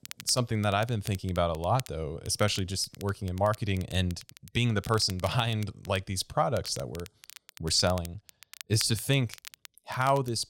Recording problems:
crackle, like an old record; noticeable; 20 dB below the speech

